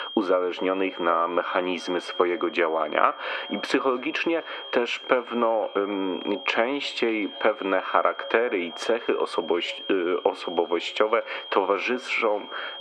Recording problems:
muffled; very; fading above 2.5 kHz
thin; somewhat; fading below 450 Hz
echo of what is said; faint; throughout; 250 ms later, 20 dB below the speech
squashed, flat; somewhat
high-pitched whine; noticeable; throughout; 3 kHz, 15 dB below the speech

